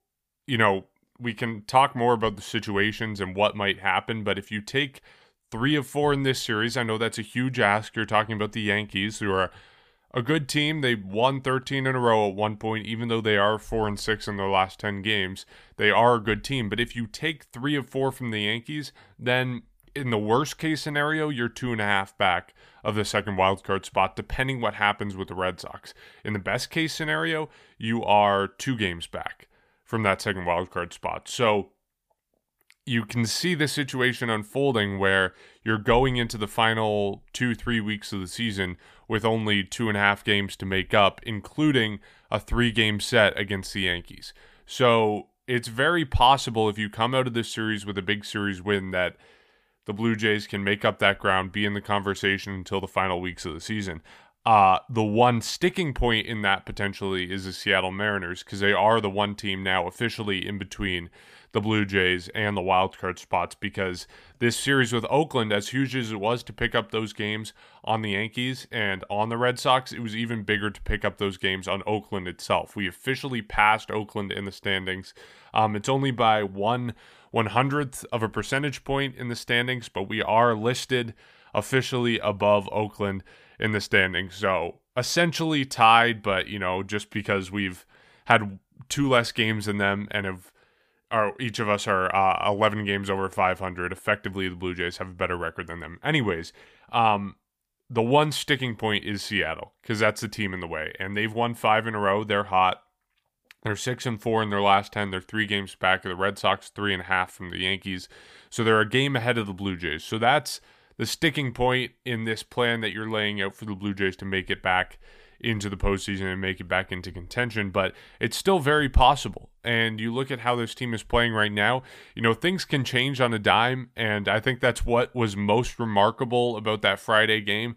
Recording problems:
none

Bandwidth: 15 kHz